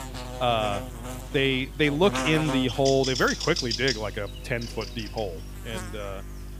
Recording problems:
electrical hum; loud; throughout; 50 Hz, 7 dB below the speech

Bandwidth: 15 kHz